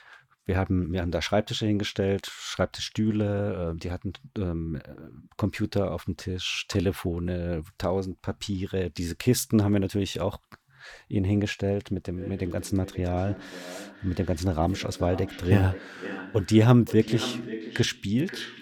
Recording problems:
echo of what is said; noticeable; from 12 s on; 530 ms later, 10 dB below the speech

